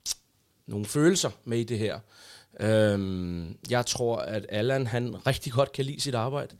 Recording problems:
none

